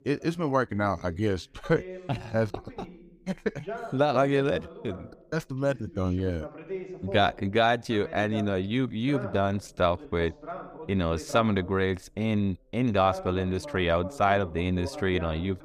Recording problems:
voice in the background; noticeable; throughout; 15 dB below the speech

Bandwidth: 15 kHz